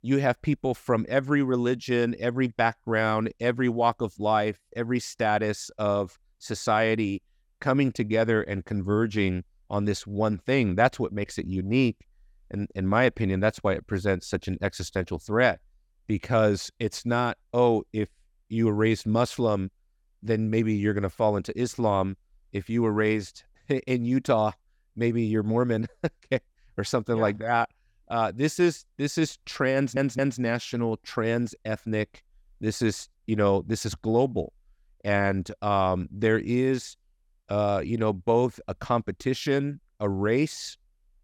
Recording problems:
audio stuttering; at 30 s

